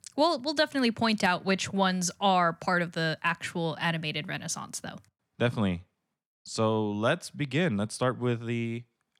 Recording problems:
none

